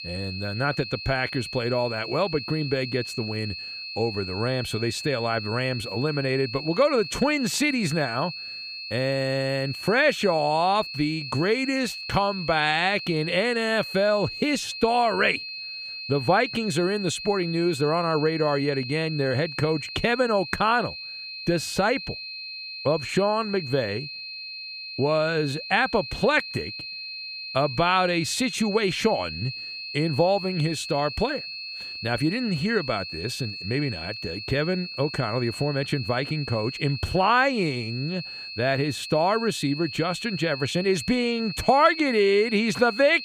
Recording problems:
high-pitched whine; loud; throughout; 4.5 kHz, 8 dB below the speech

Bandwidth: 14.5 kHz